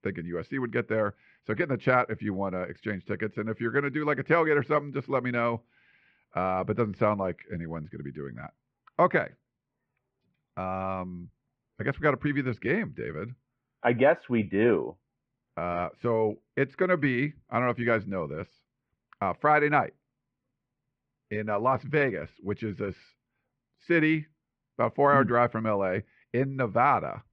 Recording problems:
muffled; very; fading above 2.5 kHz

